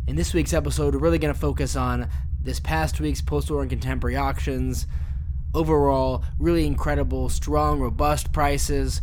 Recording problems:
low rumble; faint; throughout; 20 dB below the speech

